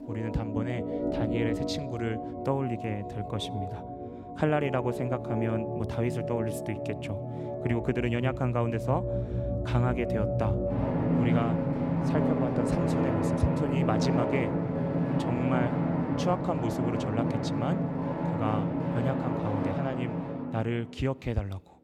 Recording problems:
background music; very loud; throughout; 2 dB above the speech

